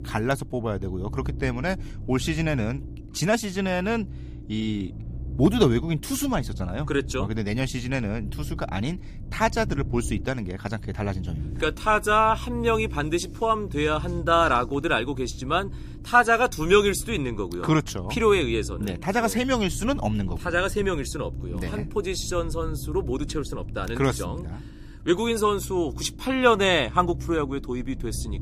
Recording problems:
low rumble; faint; throughout; 20 dB below the speech

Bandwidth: 15 kHz